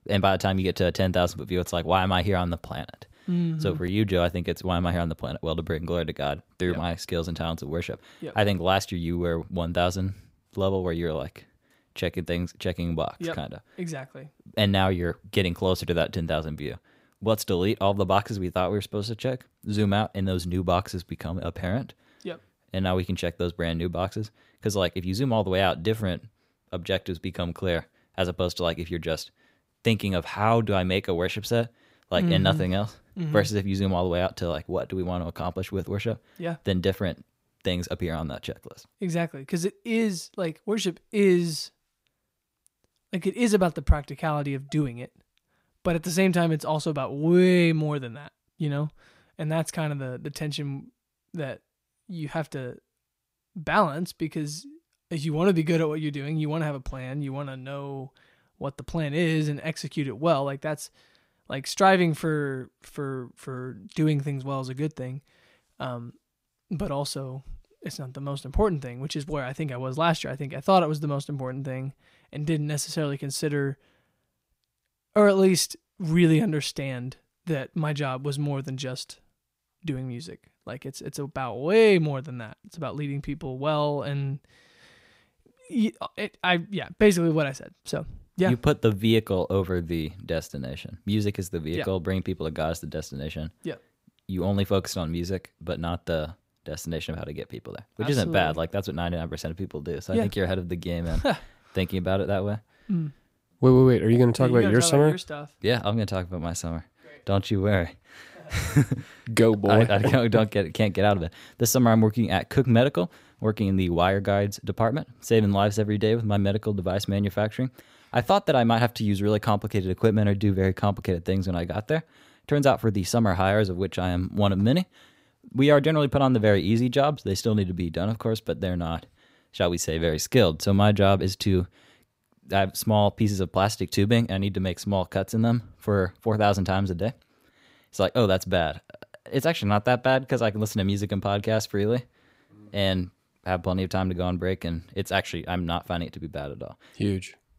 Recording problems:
none

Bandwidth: 15.5 kHz